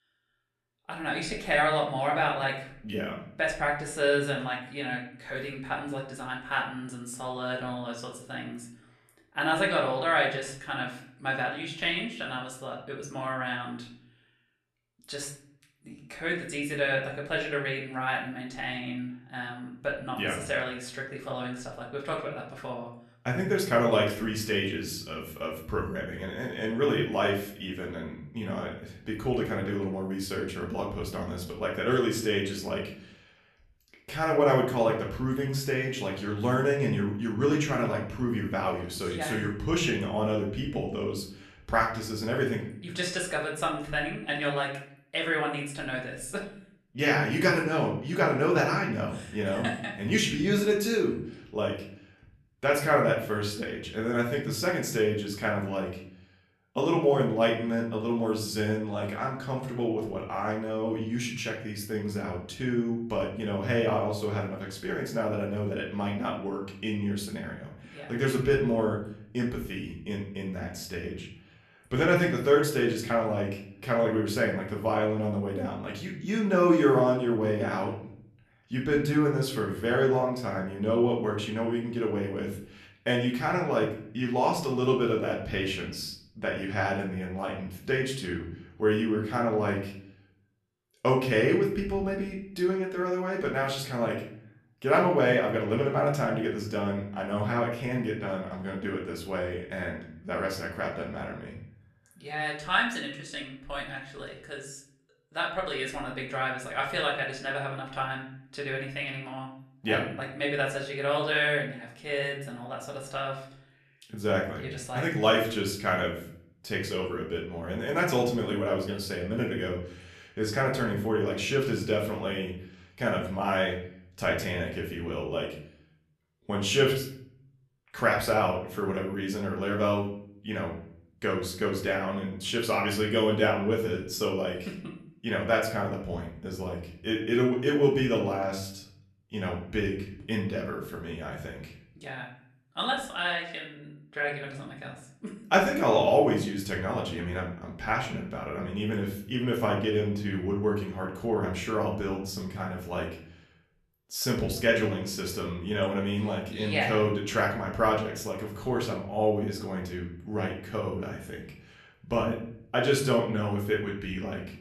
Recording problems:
off-mic speech; far
room echo; slight; dies away in 0.5 s

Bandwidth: 13.5 kHz